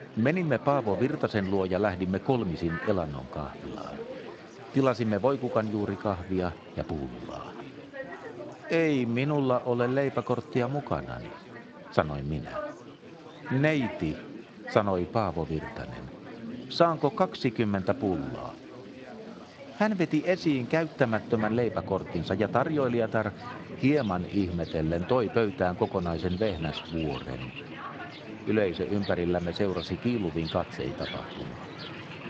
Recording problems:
garbled, watery; slightly; nothing above 7.5 kHz
rain or running water; noticeable; throughout; 15 dB below the speech
chatter from many people; noticeable; throughout; 15 dB below the speech

